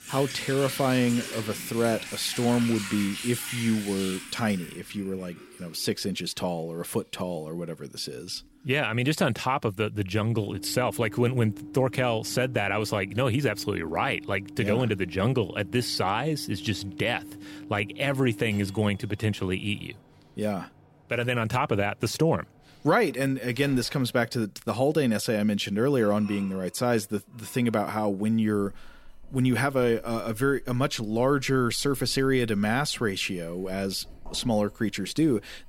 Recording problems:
household noises; noticeable; throughout; 10 dB below the speech

